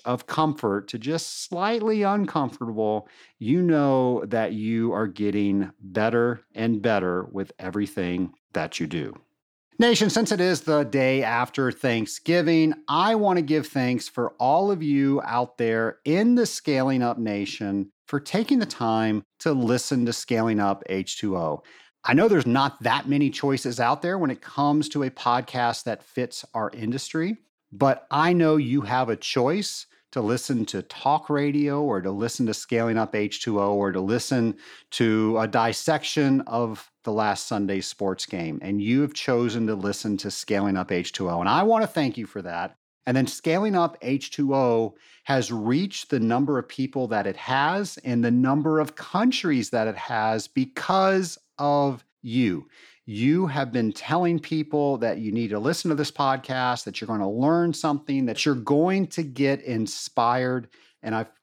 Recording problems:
none

